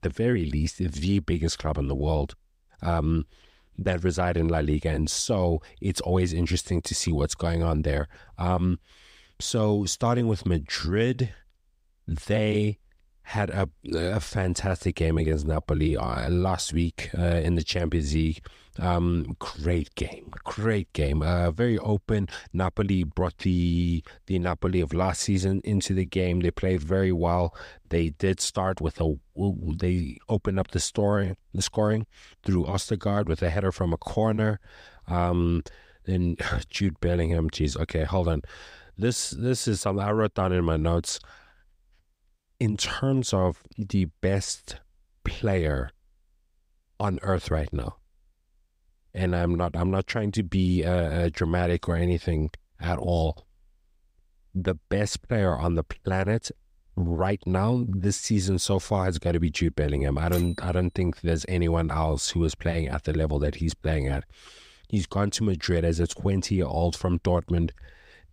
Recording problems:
none

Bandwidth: 15.5 kHz